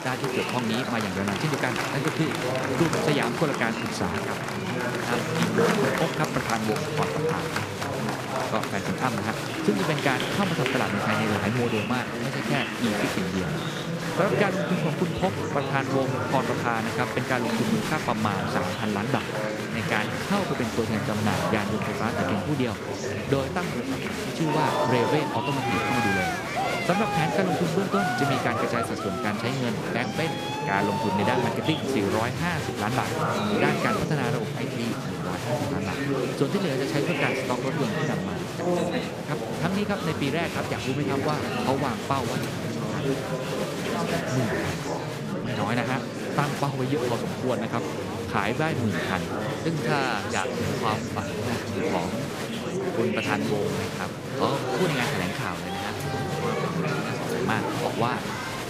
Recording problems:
murmuring crowd; very loud; throughout; 1 dB above the speech
background music; very faint; throughout; 25 dB below the speech

